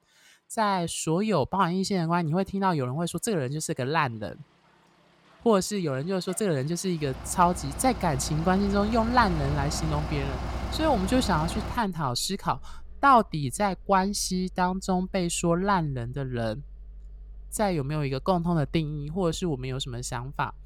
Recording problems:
traffic noise; noticeable; throughout; 10 dB below the speech

